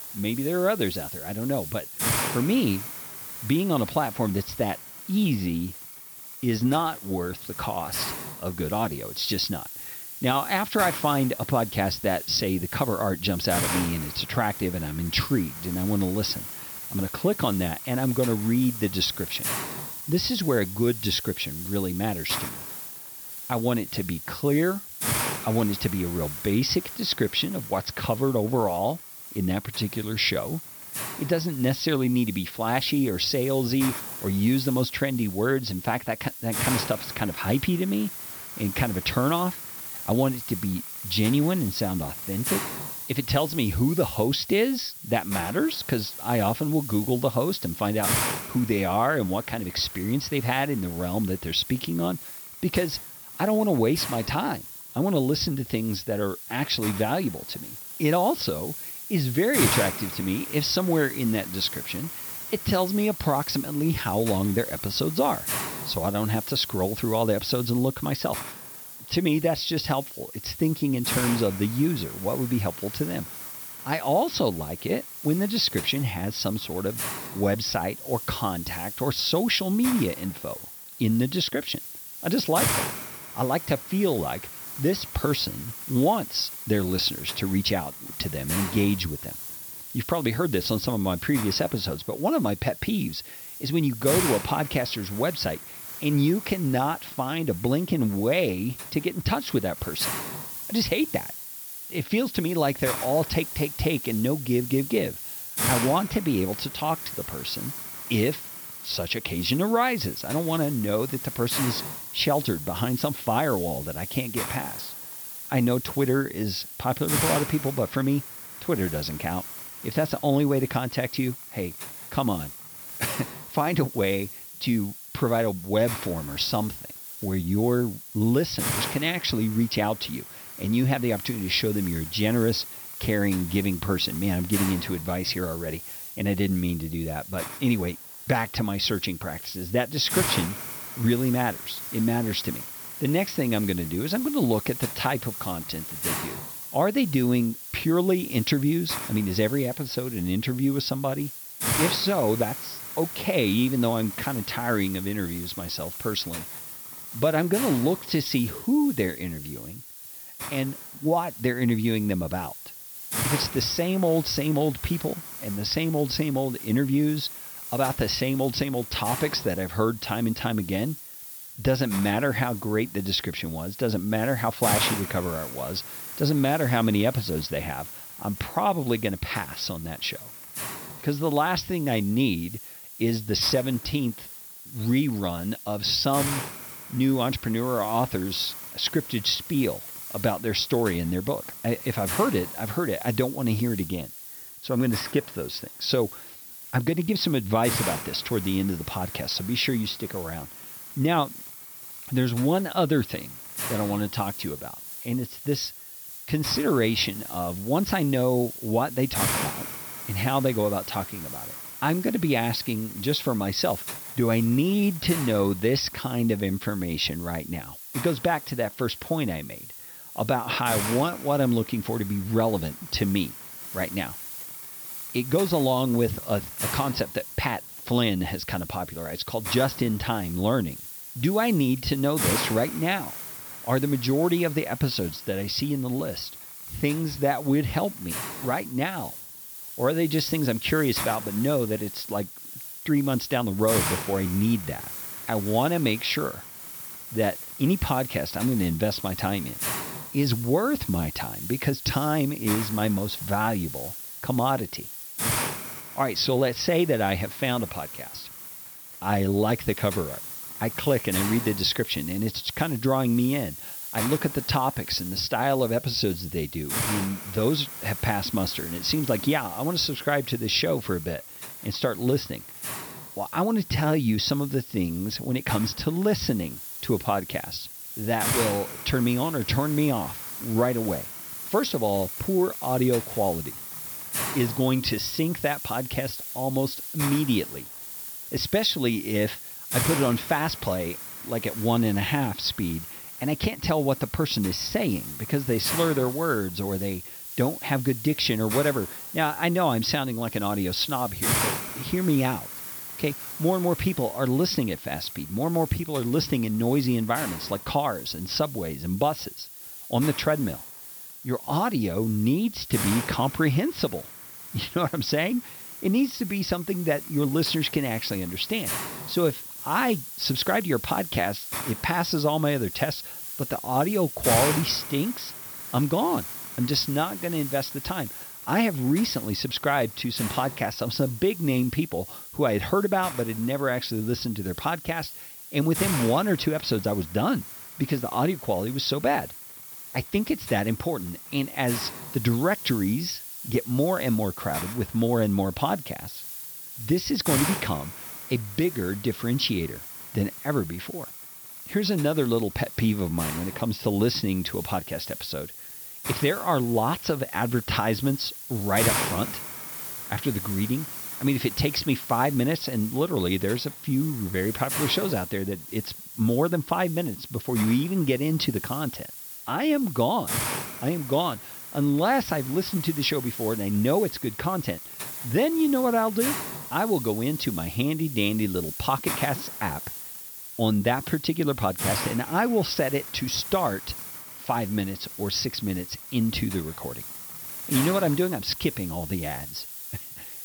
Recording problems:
high frequencies cut off; noticeable; nothing above 6 kHz
hiss; loud; throughout; 7 dB below the speech

